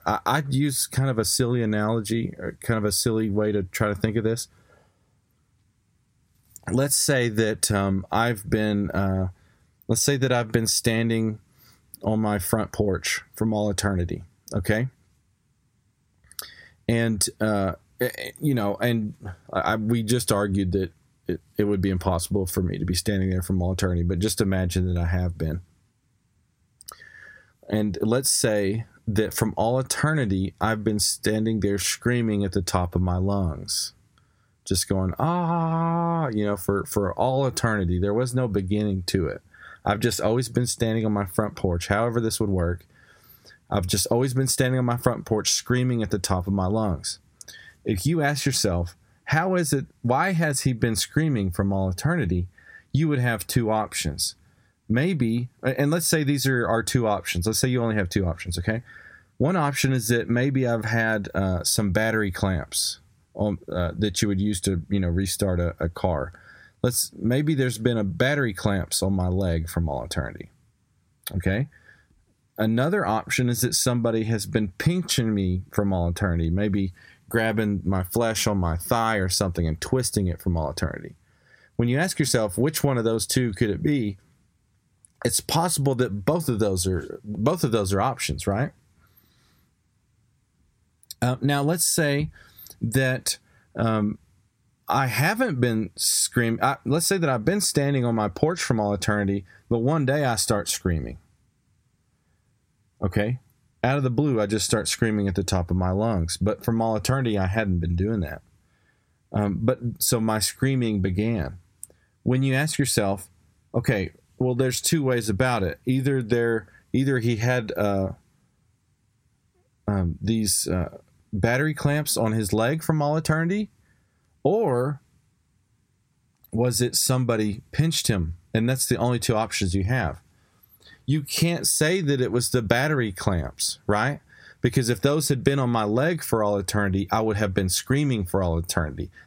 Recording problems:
squashed, flat; heavily

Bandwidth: 16 kHz